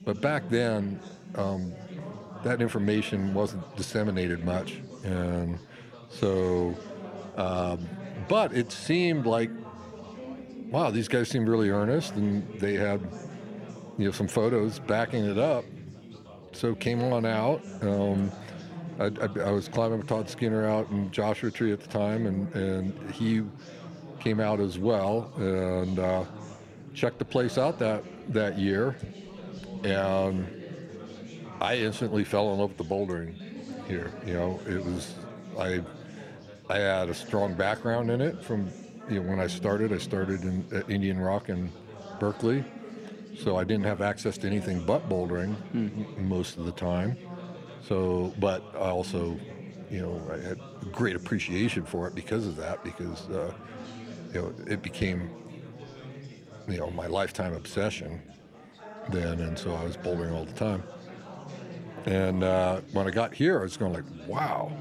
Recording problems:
chatter from many people; noticeable; throughout; 15 dB below the speech

